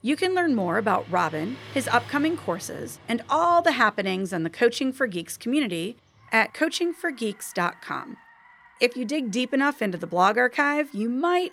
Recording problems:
traffic noise; faint; throughout; 20 dB below the speech

